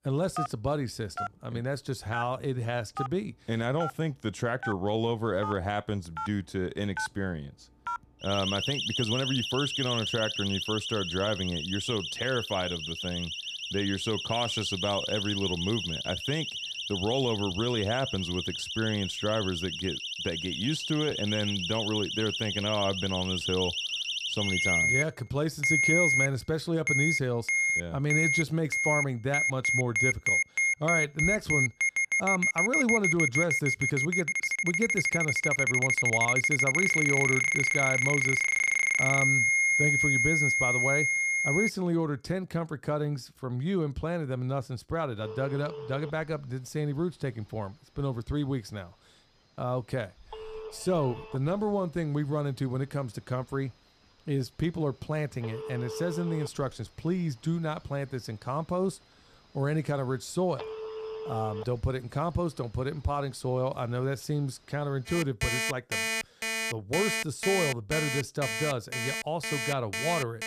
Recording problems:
alarms or sirens; very loud; throughout; 4 dB above the speech

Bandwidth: 14.5 kHz